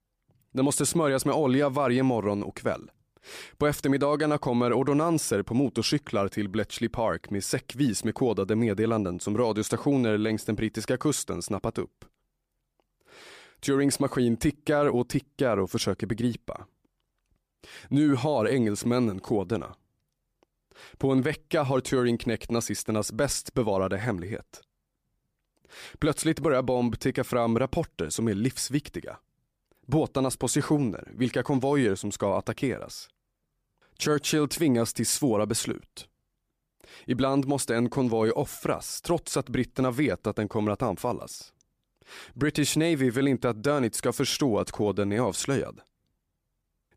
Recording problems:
none

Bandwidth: 15 kHz